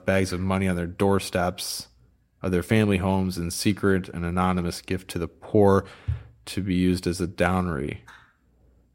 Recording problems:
none

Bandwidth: 16 kHz